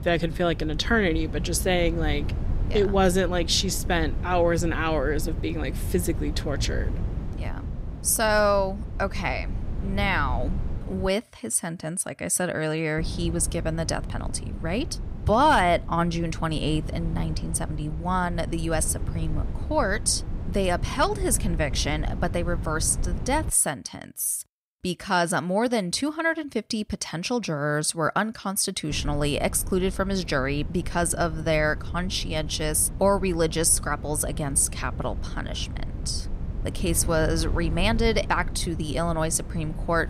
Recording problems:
wind noise on the microphone; occasional gusts; until 11 s, from 13 to 24 s and from 29 s on; 20 dB below the speech

